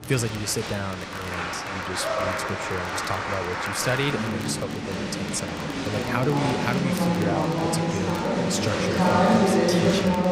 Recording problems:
crowd noise; very loud; throughout; 5 dB above the speech
crackle, like an old record; noticeable; 20 dB below the speech

